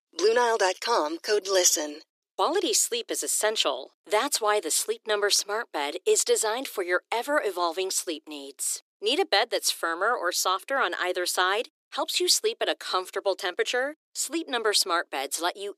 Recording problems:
thin; very; fading below 300 Hz

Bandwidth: 14.5 kHz